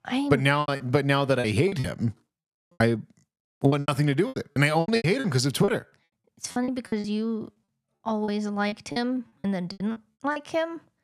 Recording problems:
choppy; very; 16% of the speech affected

